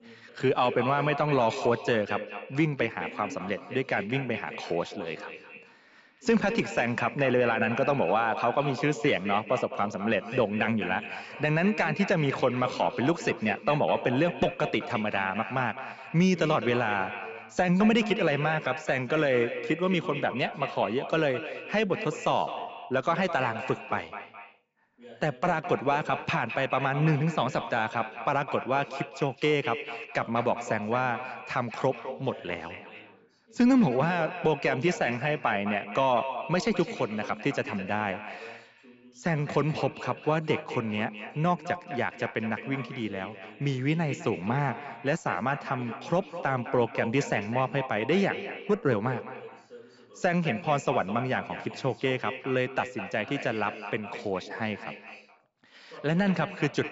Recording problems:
echo of what is said; strong; throughout; 210 ms later, 10 dB below the speech
high frequencies cut off; noticeable; nothing above 8 kHz
voice in the background; faint; throughout; 20 dB below the speech

